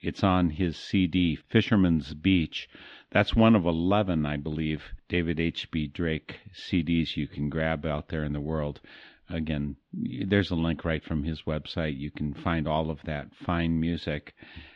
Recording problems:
muffled; slightly; fading above 3.5 kHz

